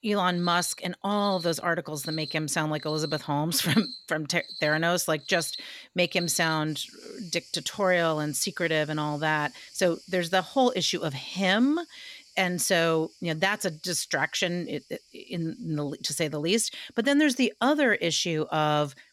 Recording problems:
animal sounds; noticeable; throughout; 15 dB below the speech

